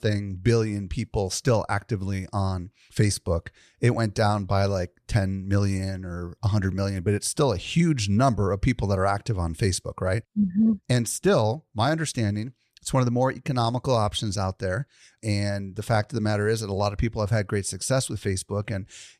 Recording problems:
none

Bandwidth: 13.5 kHz